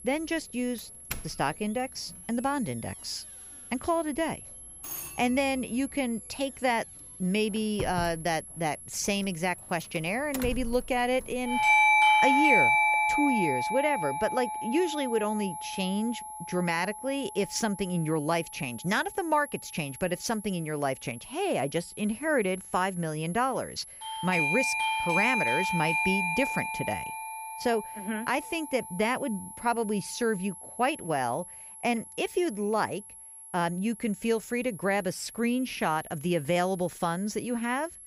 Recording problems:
alarms or sirens; very loud; throughout; 3 dB above the speech
high-pitched whine; noticeable; throughout; 11 kHz, 15 dB below the speech

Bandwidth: 15.5 kHz